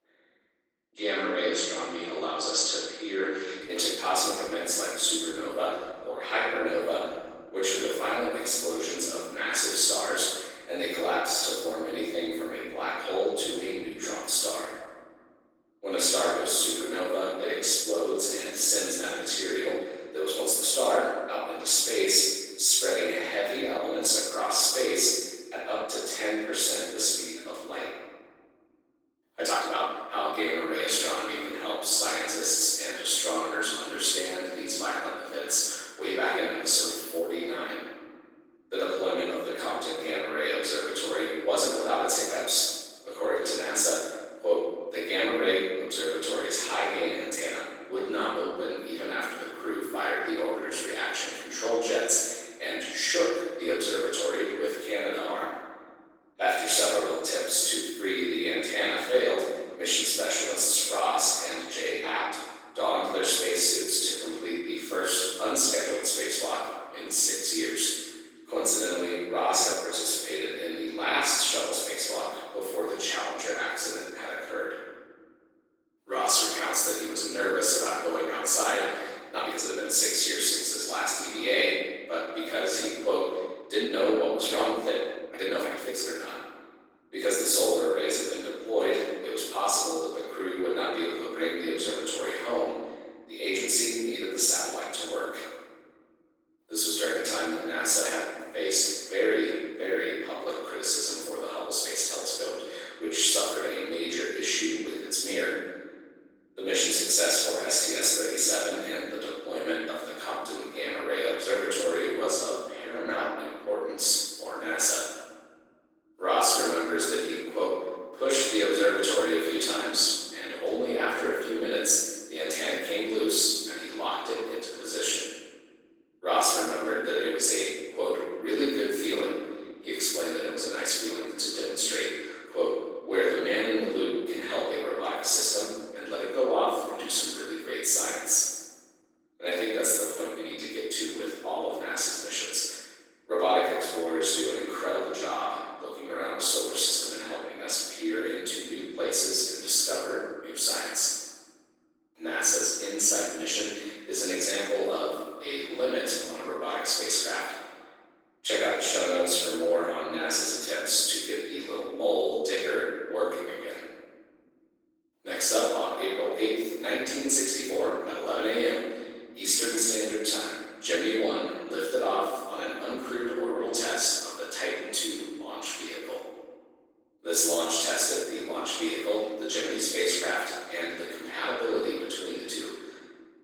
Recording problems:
room echo; strong; dies away in 1.5 s
off-mic speech; far
thin; somewhat; fading below 300 Hz
garbled, watery; slightly
uneven, jittery; strongly; from 29 s to 2:50

